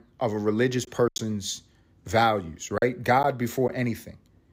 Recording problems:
choppy; very; 5% of the speech affected

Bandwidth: 15.5 kHz